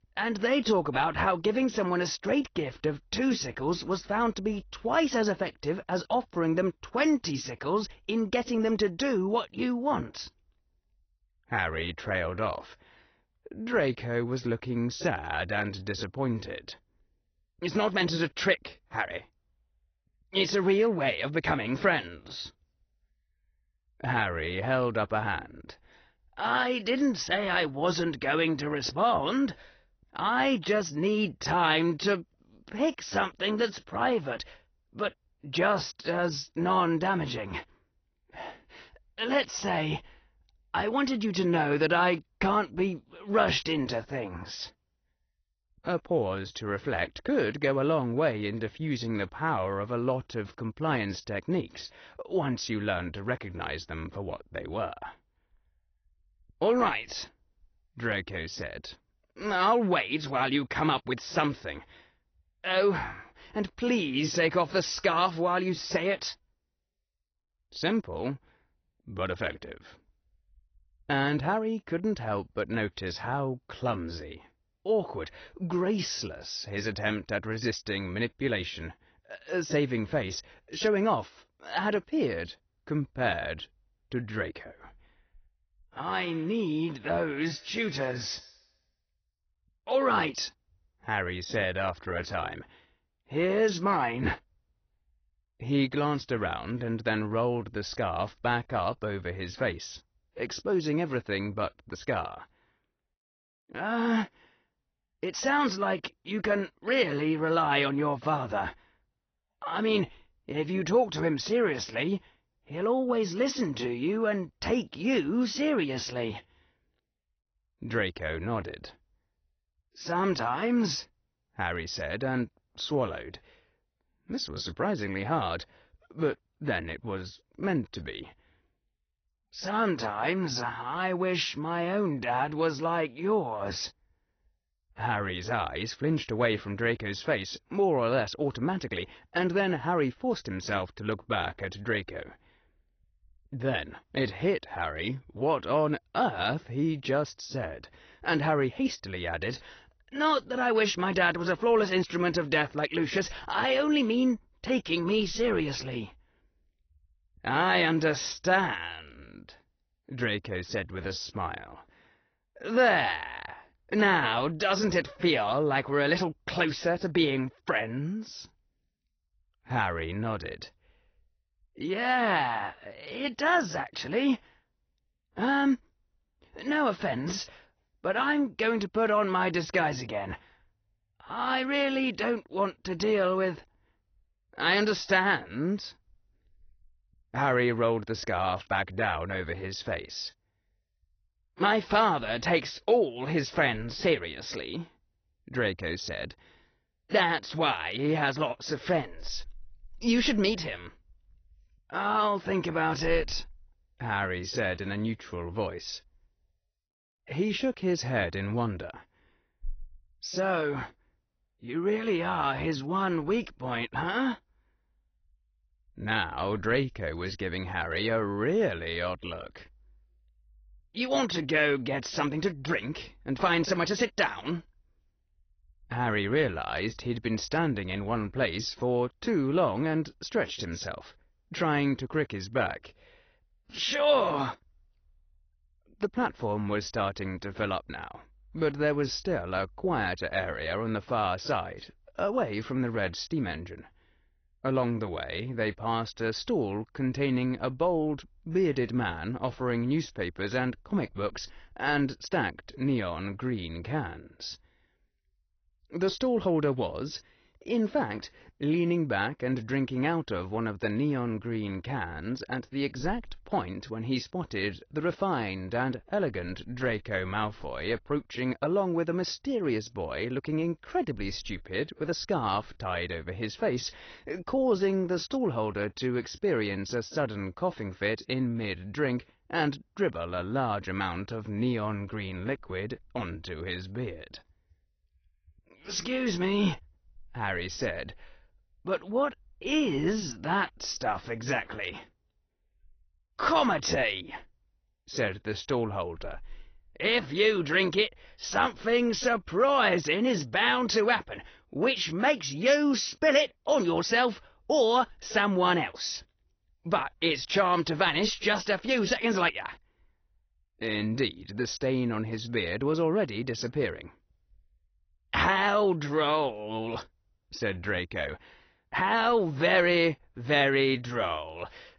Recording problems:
high frequencies cut off; noticeable; nothing above 6 kHz
garbled, watery; slightly

